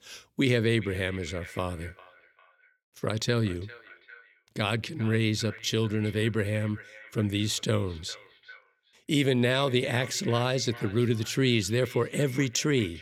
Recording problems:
echo of what is said; faint; throughout; 400 ms later, 20 dB below the speech

